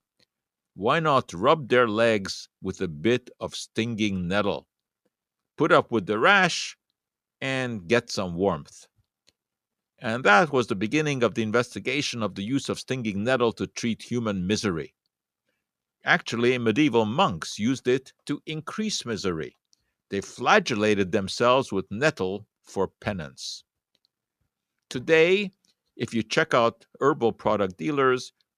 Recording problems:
none

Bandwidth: 14.5 kHz